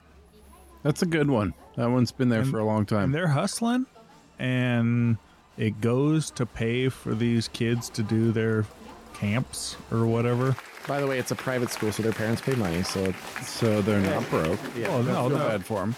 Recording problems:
crowd noise; noticeable; throughout; 10 dB below the speech

